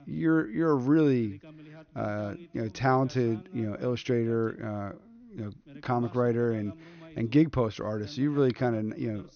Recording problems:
high frequencies cut off; noticeable; nothing above 6.5 kHz
voice in the background; faint; throughout; 25 dB below the speech

